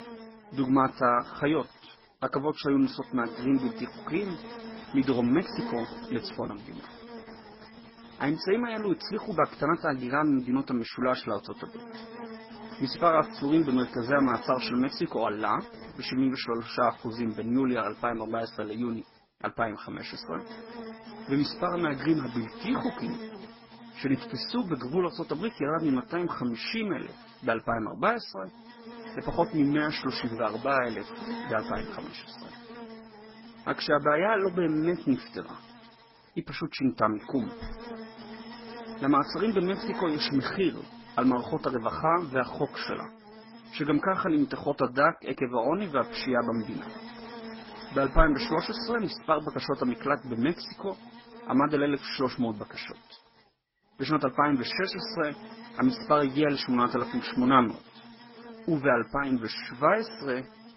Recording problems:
garbled, watery; badly; nothing above 5.5 kHz
electrical hum; noticeable; throughout; 60 Hz, 15 dB below the speech

